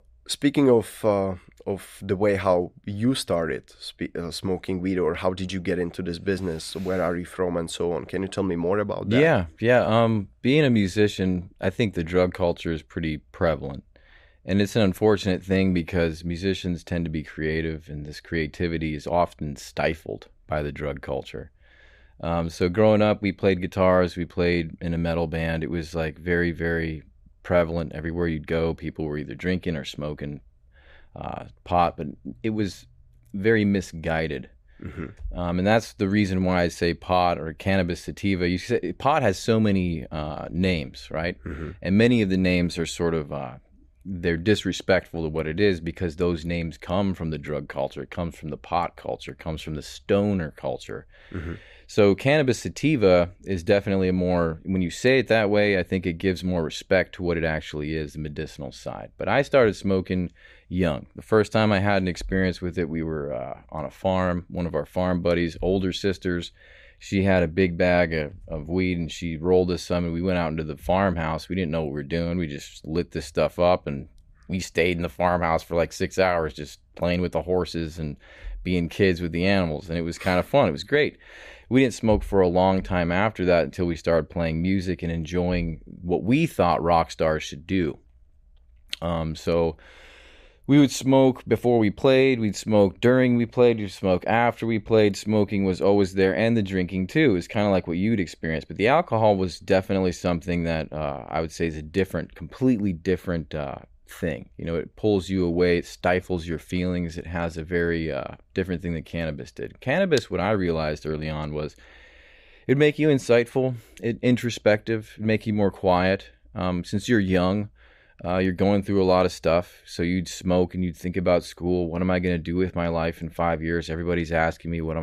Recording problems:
abrupt cut into speech; at the end

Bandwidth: 15 kHz